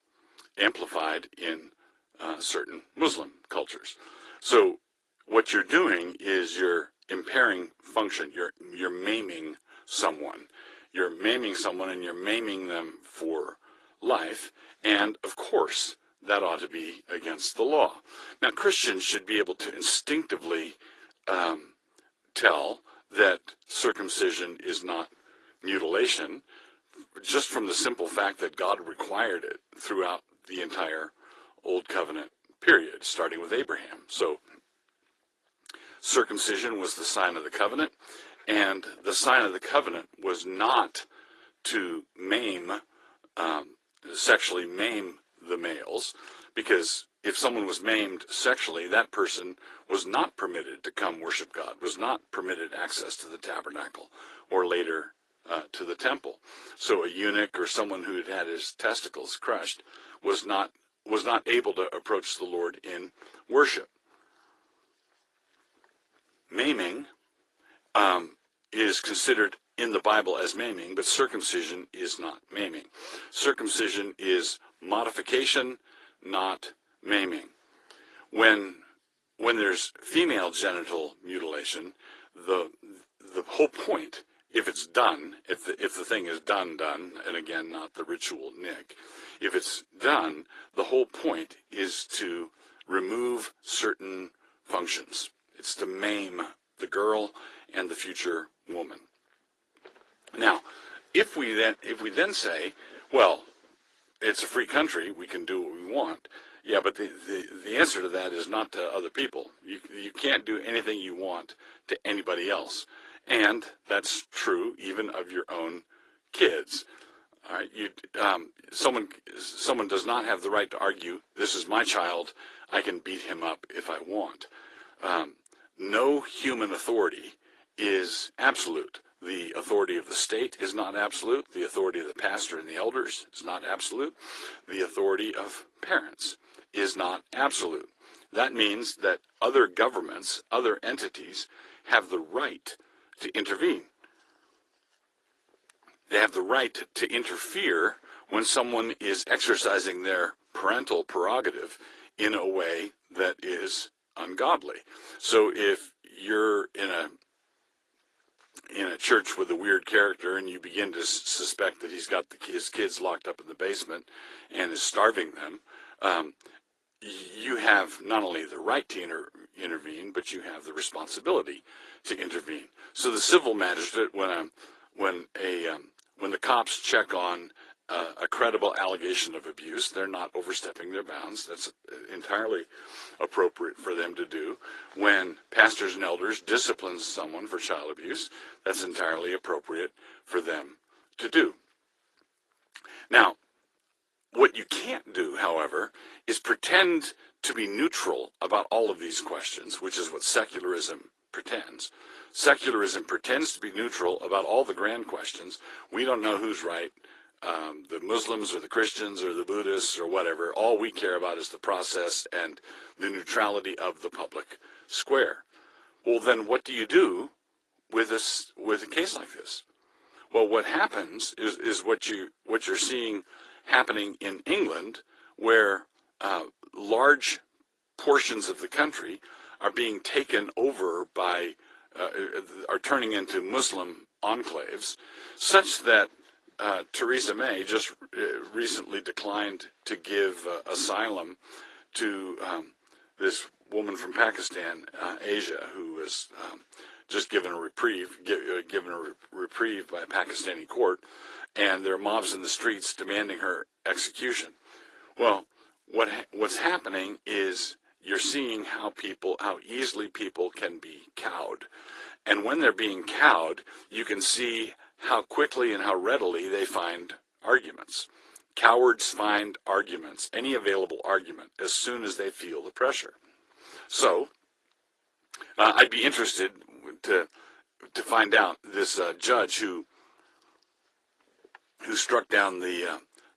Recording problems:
thin; very; fading below 350 Hz
garbled, watery; slightly

